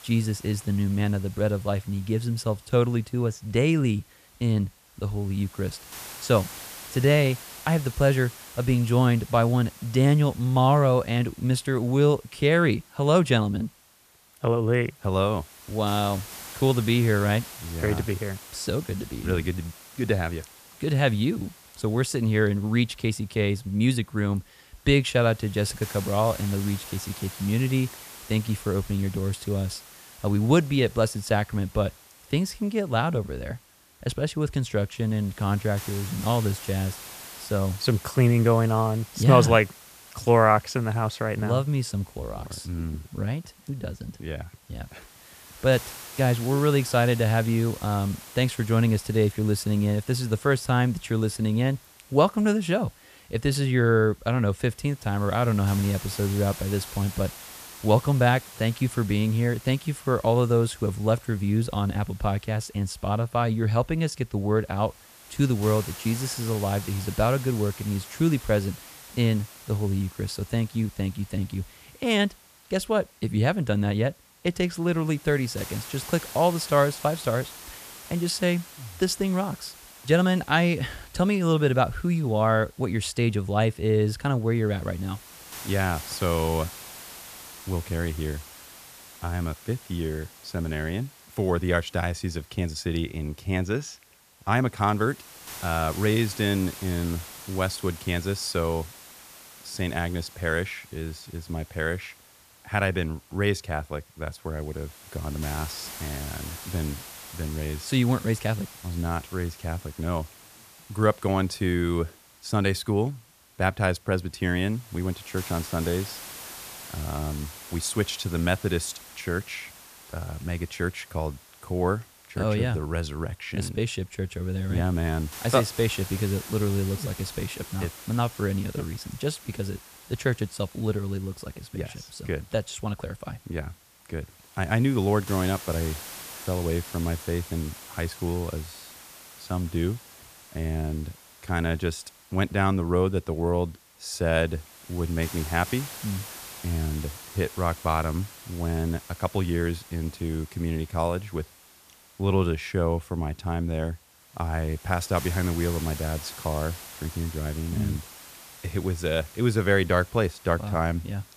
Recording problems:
hiss; noticeable; throughout; 15 dB below the speech

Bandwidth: 14.5 kHz